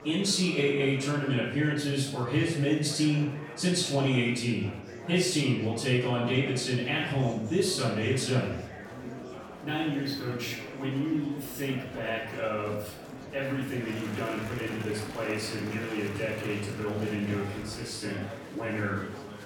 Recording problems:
off-mic speech; far
room echo; noticeable; dies away in 0.6 s
murmuring crowd; noticeable; throughout; 10 dB below the speech

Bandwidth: 18 kHz